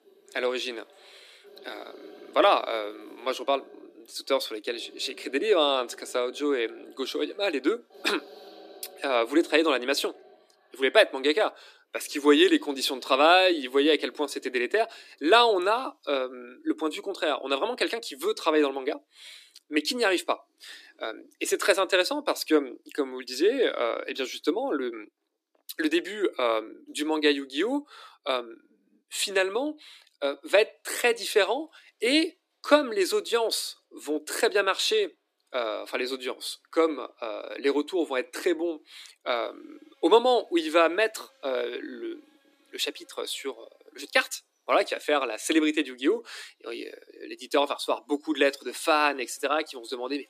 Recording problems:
thin; somewhat; fading below 300 Hz
animal sounds; faint; throughout; 25 dB below the speech

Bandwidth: 14.5 kHz